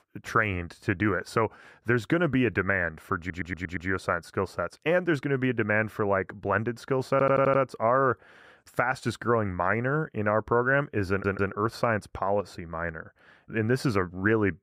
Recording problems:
muffled; slightly; fading above 2 kHz
audio stuttering; at 3 s, at 7 s and at 11 s

